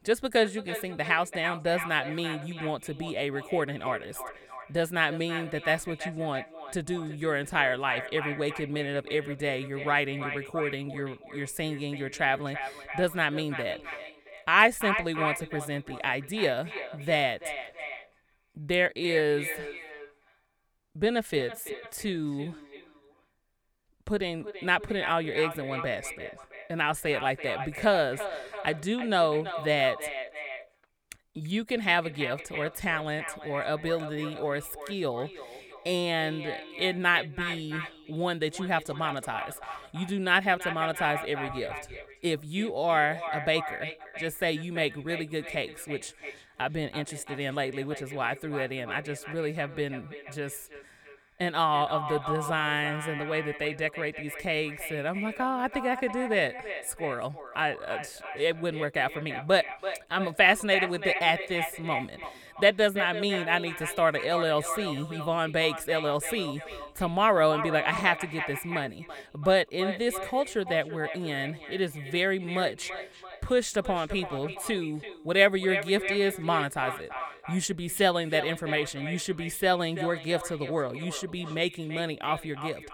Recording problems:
echo of what is said; strong; throughout; 330 ms later, 9 dB below the speech

